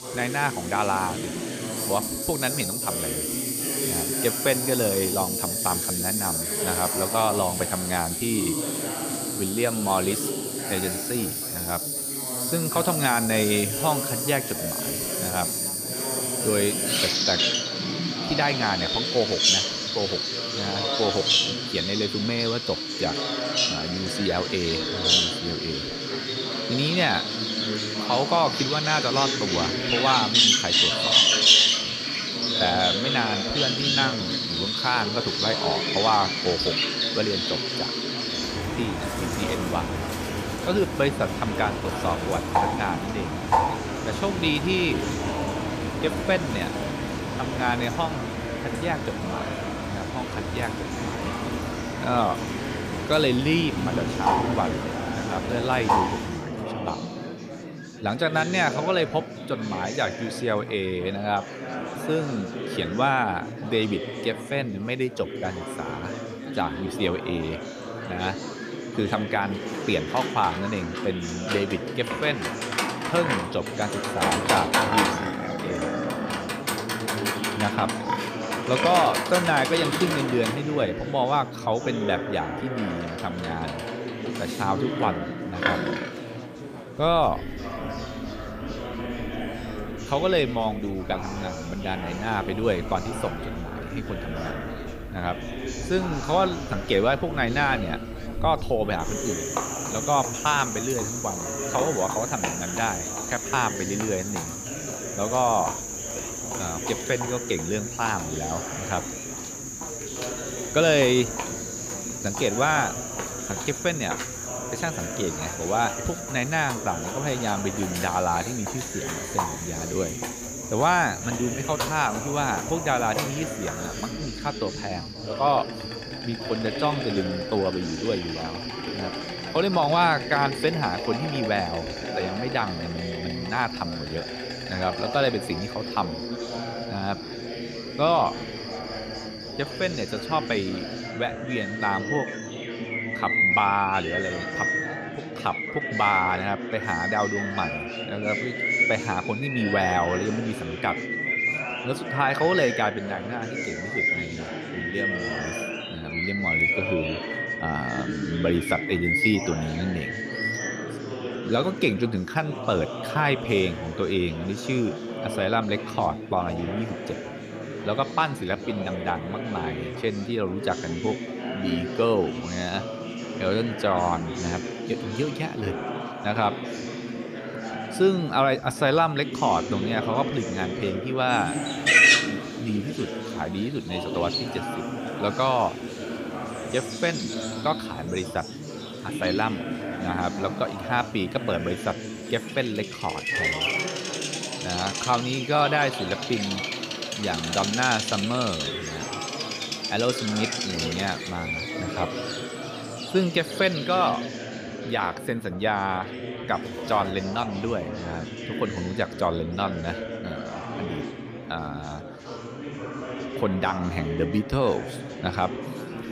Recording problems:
animal sounds; loud; throughout; as loud as the speech
chatter from many people; loud; throughout; 7 dB below the speech

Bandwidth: 15 kHz